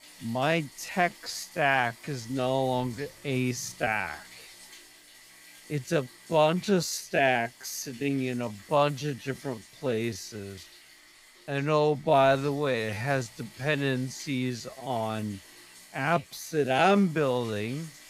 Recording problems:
wrong speed, natural pitch; too slow; 0.5 times normal speed
household noises; faint; throughout; 20 dB below the speech

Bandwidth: 15.5 kHz